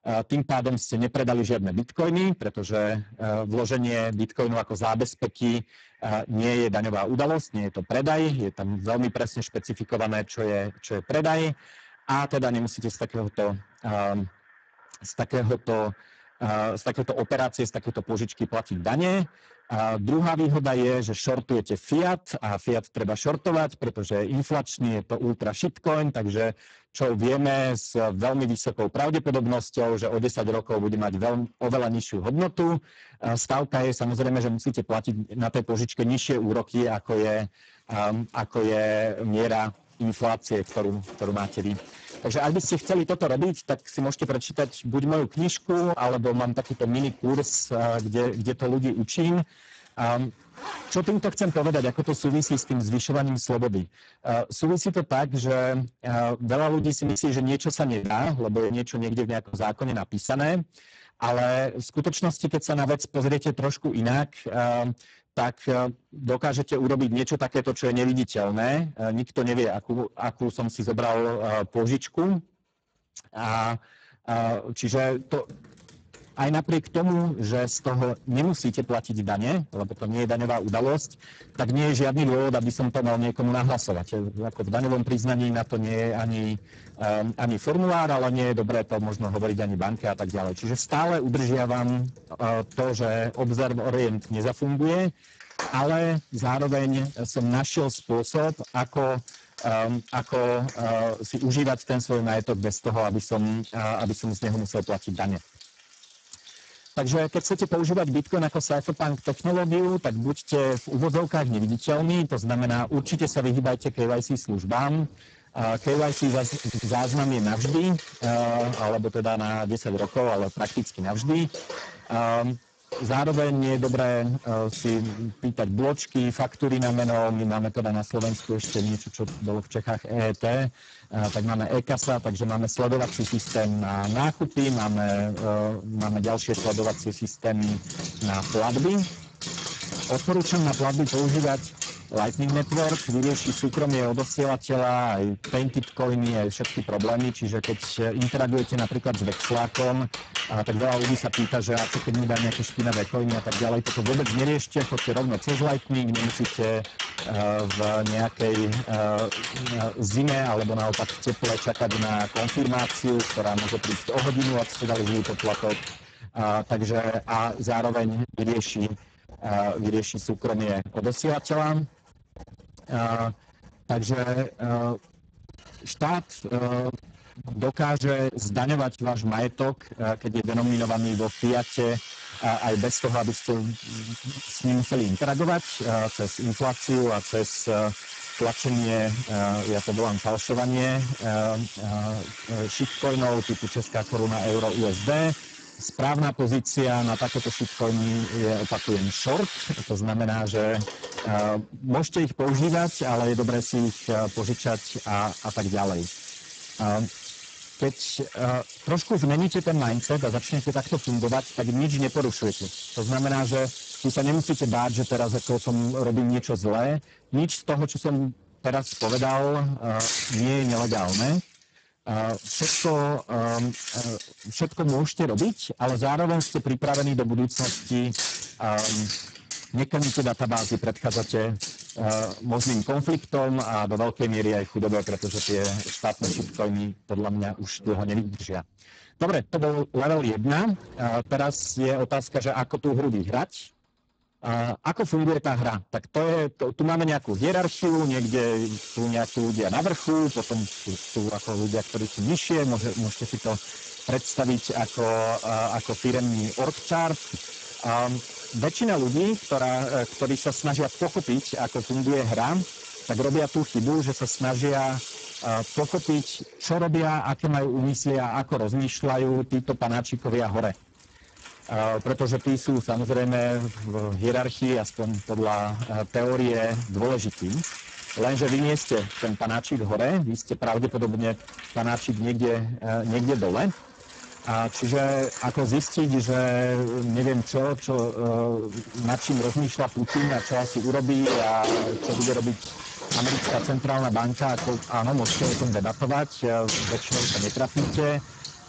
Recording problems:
distortion; heavy; 14% of the sound clipped
garbled, watery; badly; nothing above 7.5 kHz
household noises; loud; throughout; 9 dB below the speech
choppy; very; from 57 s to 1:00; 9% of the speech affected
audio stuttering; at 1:57

